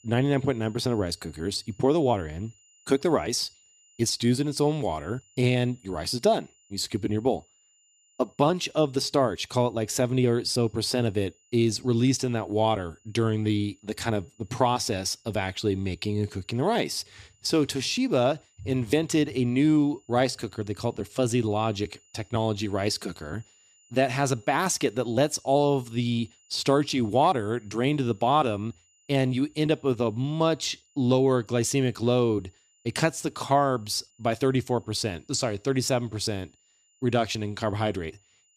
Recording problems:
high-pitched whine; faint; throughout; 7 kHz, 35 dB below the speech

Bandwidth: 14.5 kHz